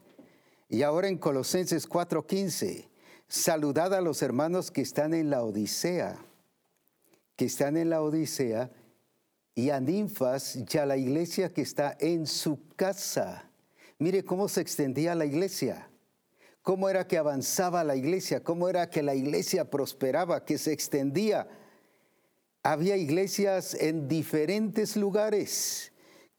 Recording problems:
squashed, flat; heavily

